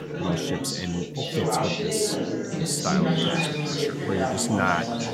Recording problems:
chatter from many people; very loud; throughout; 2 dB above the speech
animal sounds; loud; throughout; 3 dB below the speech

